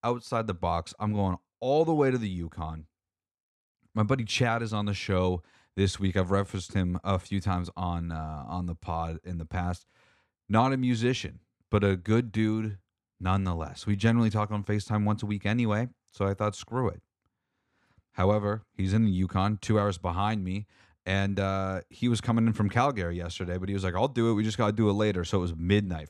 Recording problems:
none

